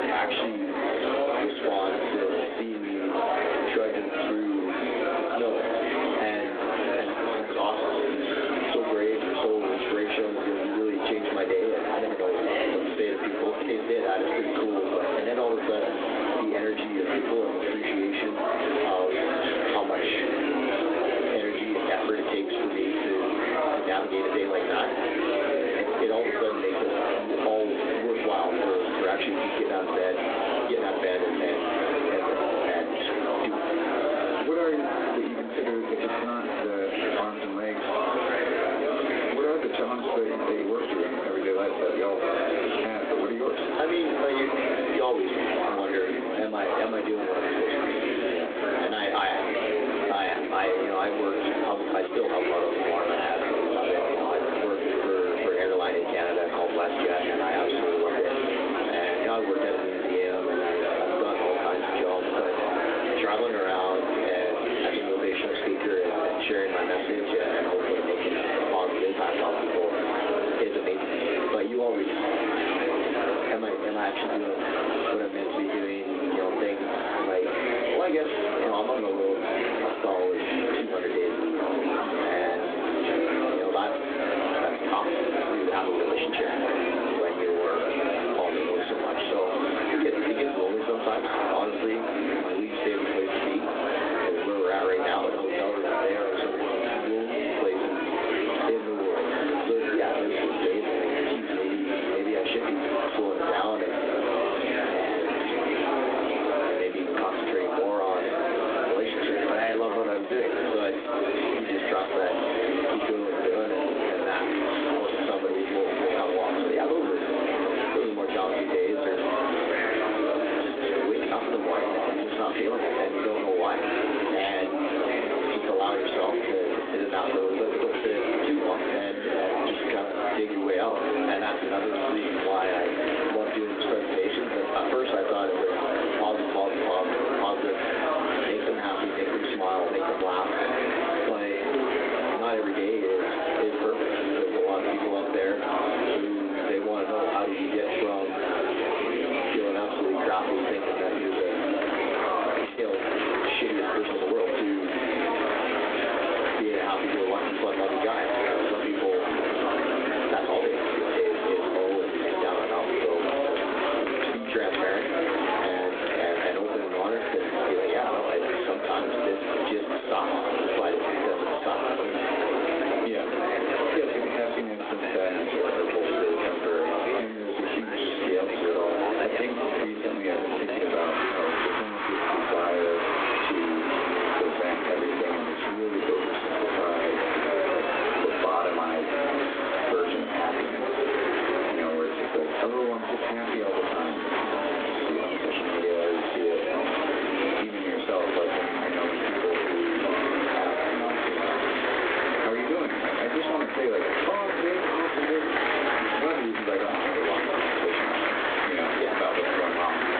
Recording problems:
phone-call audio; poor line
off-mic speech; far
squashed, flat; heavily
room echo; very slight; dies away in 0.3 s
murmuring crowd; very loud; throughout; as loud as the speech
uneven, jittery; strongly; from 50 s to 2:35

